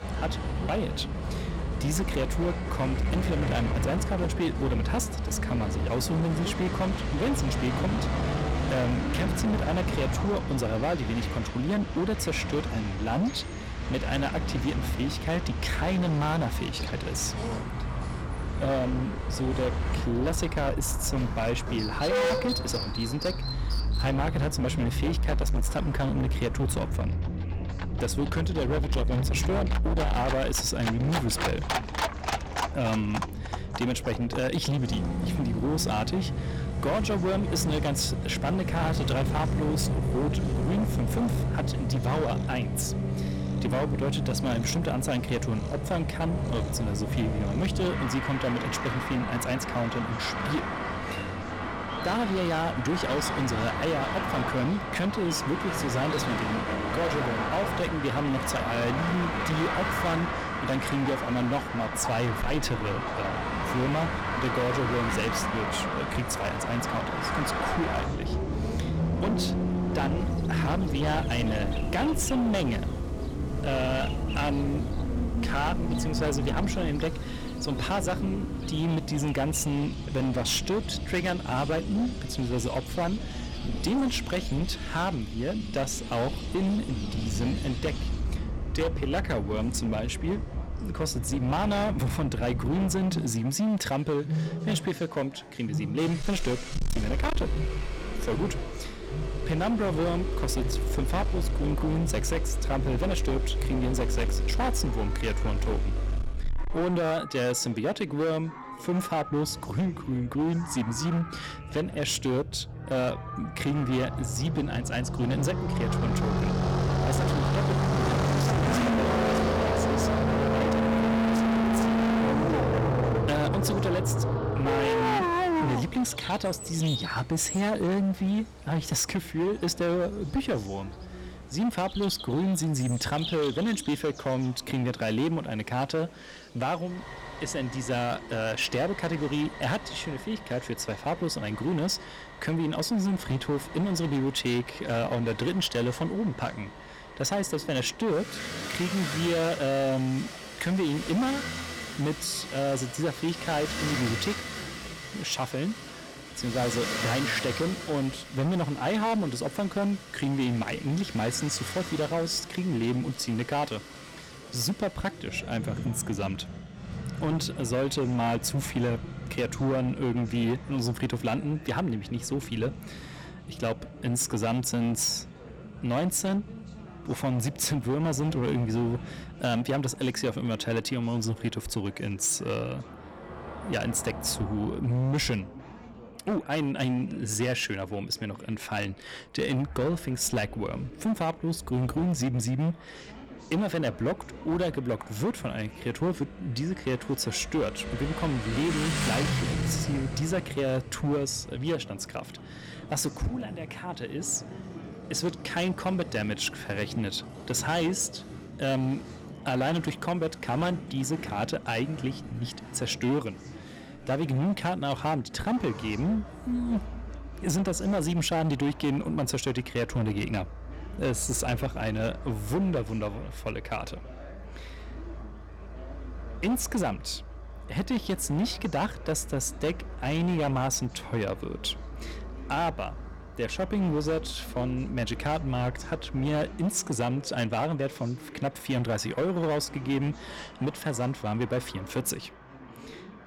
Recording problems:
distortion; heavy; 16% of the sound clipped
animal sounds; loud; until 2:19; 10 dB below the speech
traffic noise; loud; throughout; 2 dB below the speech
background chatter; noticeable; throughout; 4 voices, 20 dB below the speech

